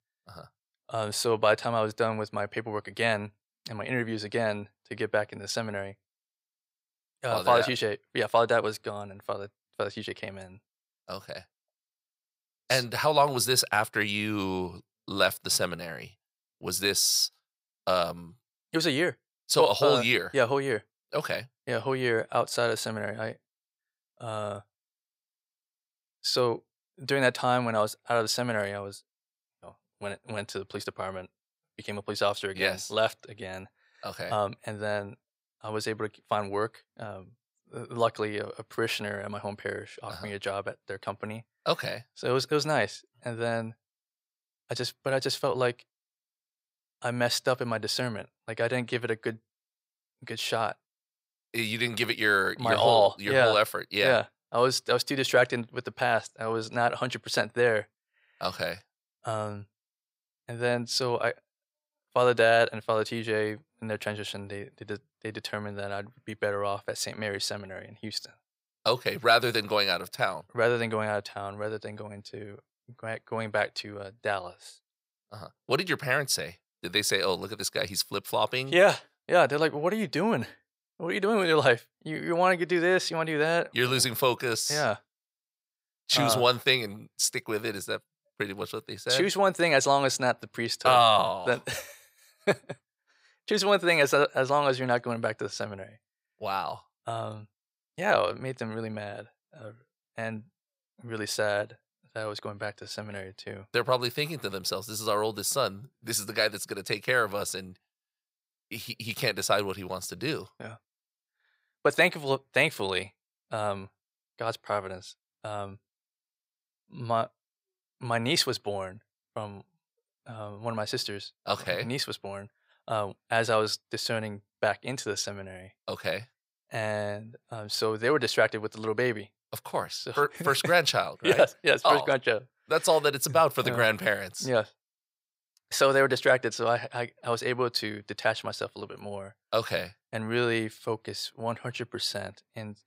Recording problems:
thin; somewhat; fading below 550 Hz

